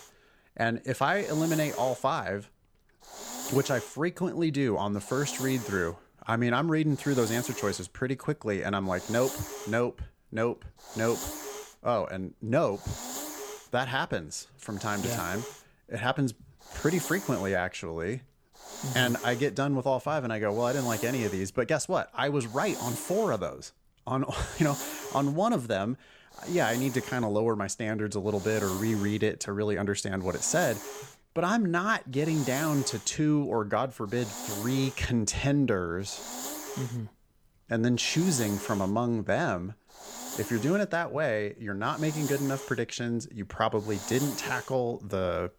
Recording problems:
hiss; loud; throughout; 10 dB below the speech

